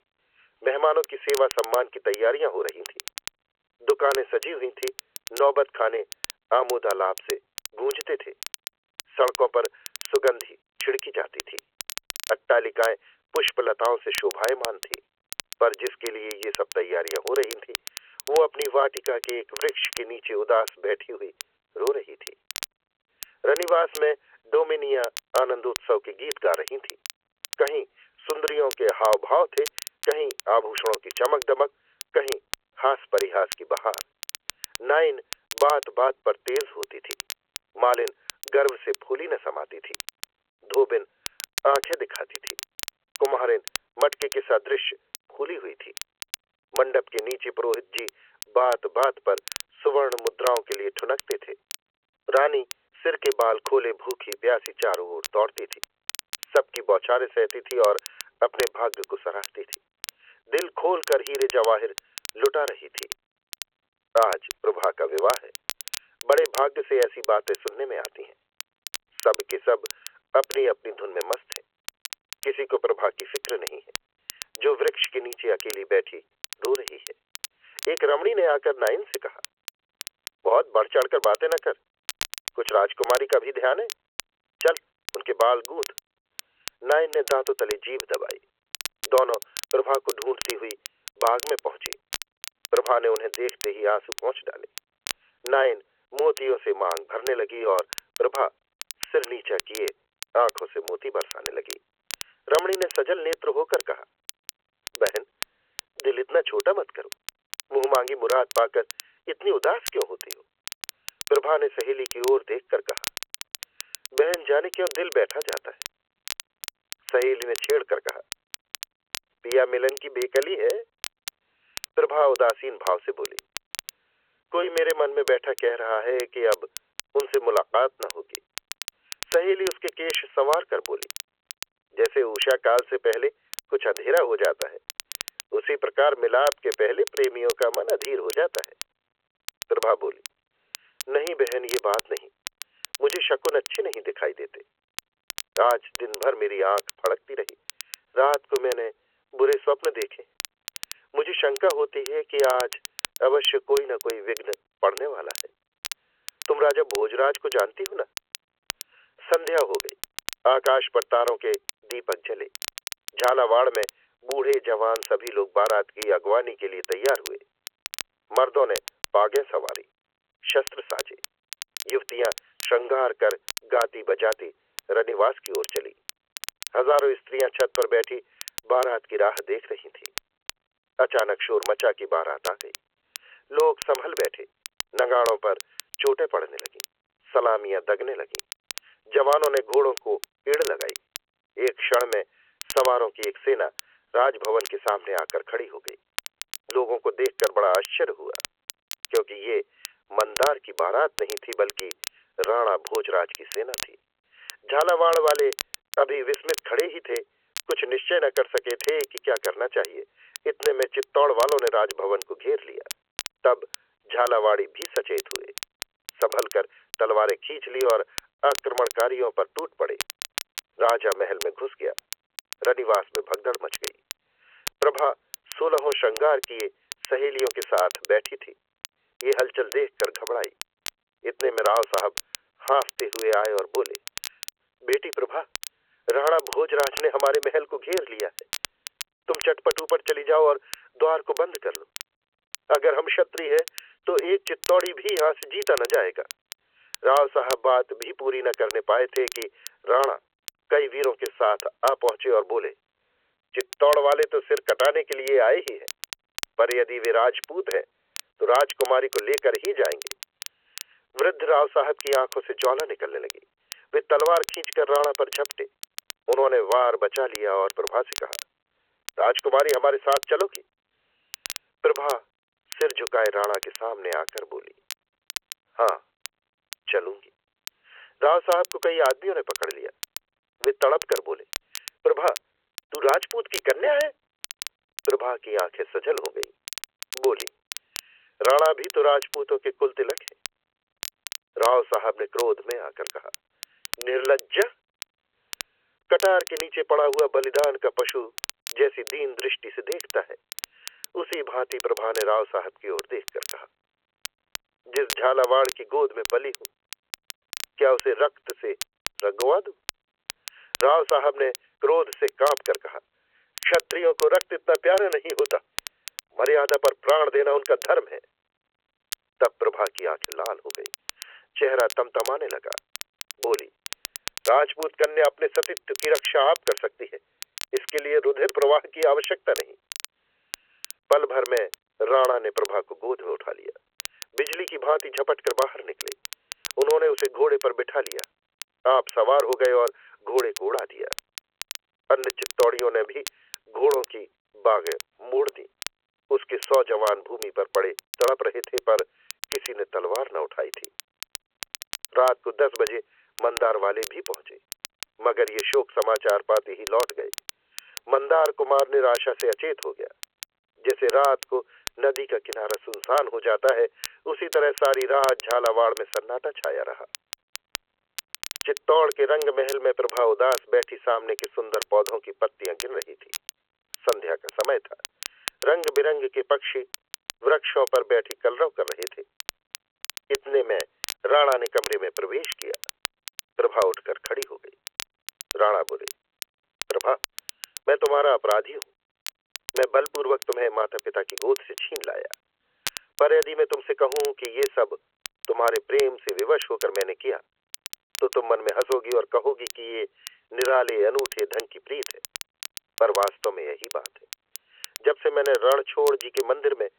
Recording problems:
phone-call audio; nothing above 3 kHz
crackle, like an old record; noticeable; 15 dB below the speech

